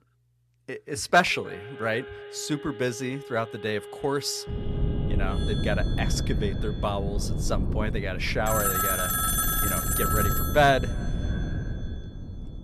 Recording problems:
echo of what is said; faint; throughout; 310 ms later, 25 dB below the speech
alarms or sirens; loud; throughout; 2 dB below the speech
wind noise on the microphone; occasional gusts; from 4.5 s on; 15 dB below the speech

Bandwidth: 14 kHz